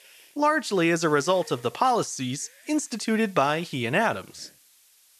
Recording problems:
hiss; faint; throughout; 25 dB below the speech

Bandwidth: 13.5 kHz